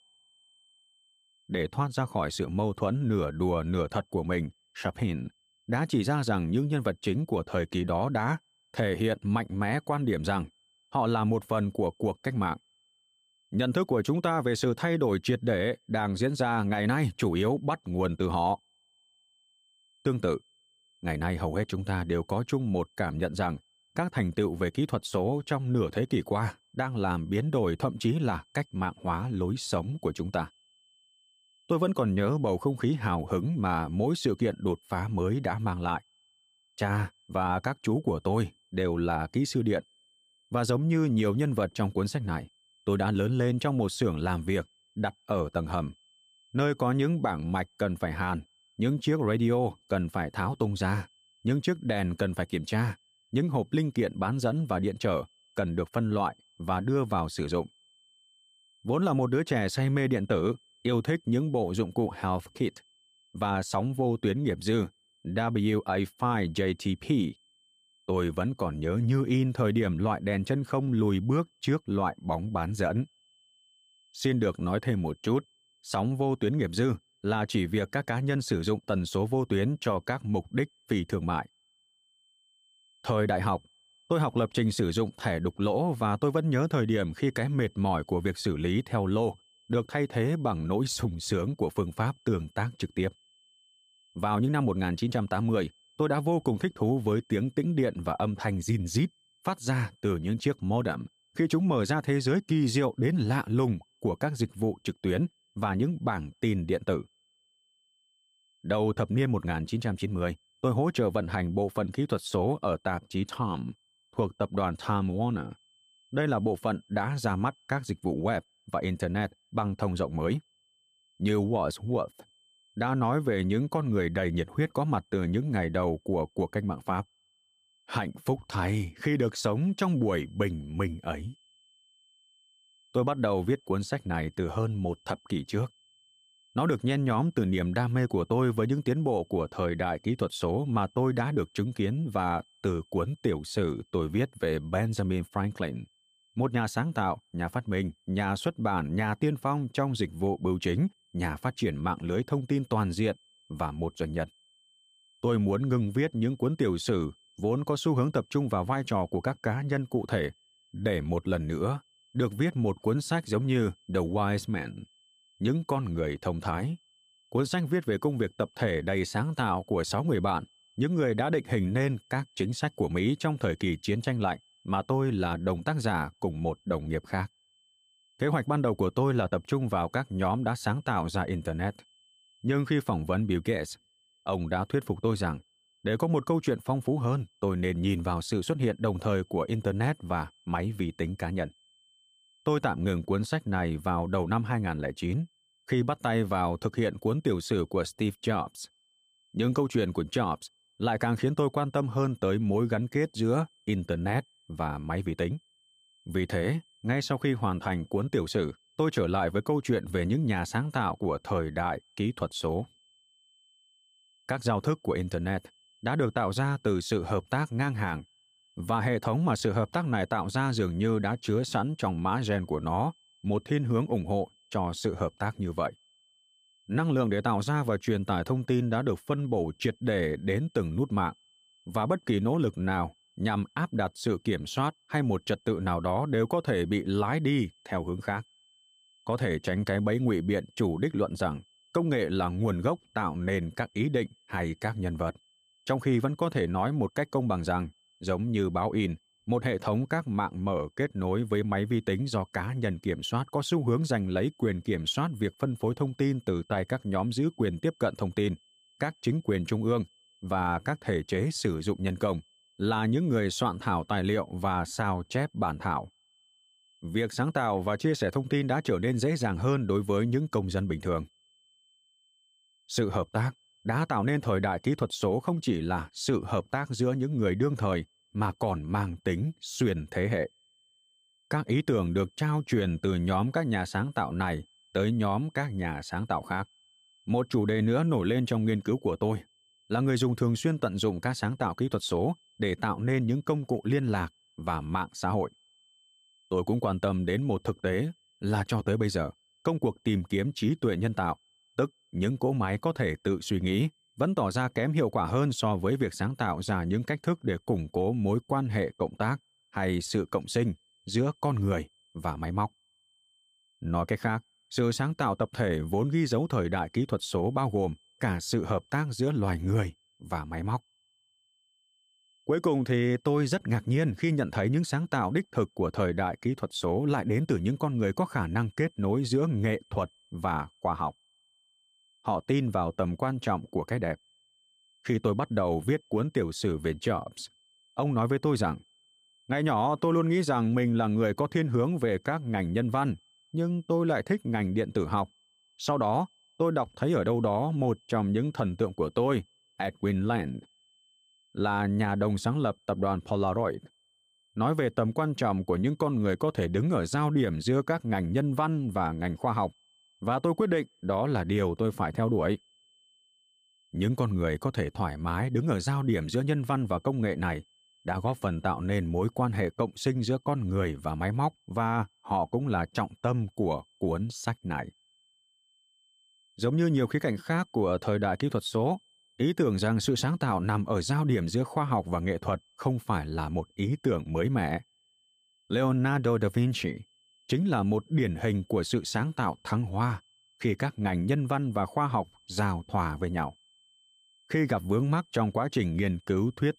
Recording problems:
high-pitched whine; faint; throughout; 3 kHz, 35 dB below the speech

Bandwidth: 15 kHz